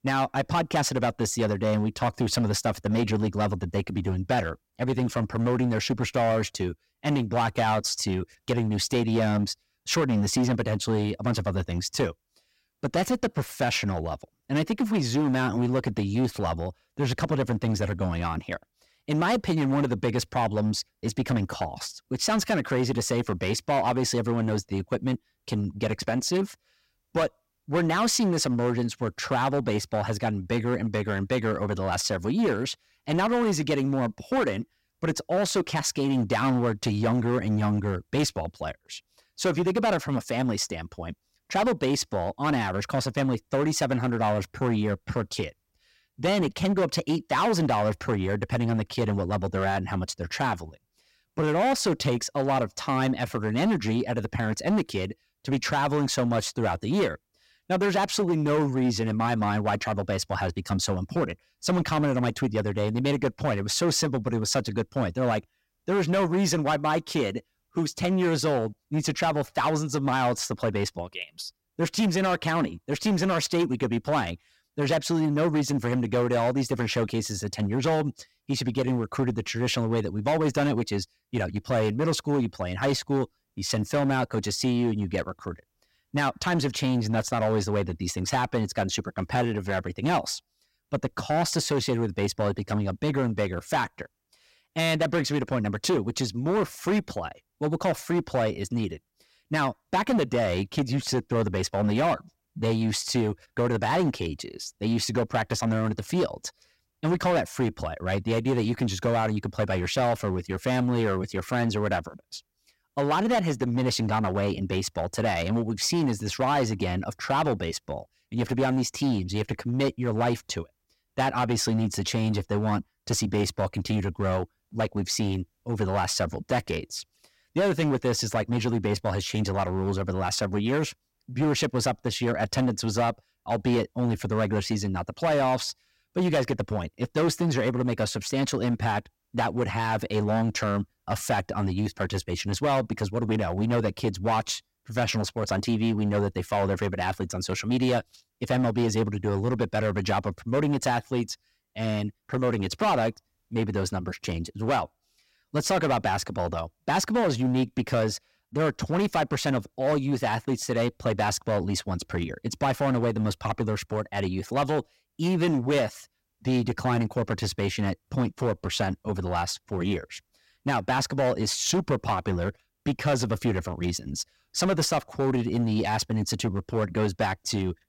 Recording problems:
distortion; slight; 9% of the sound clipped

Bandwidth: 16 kHz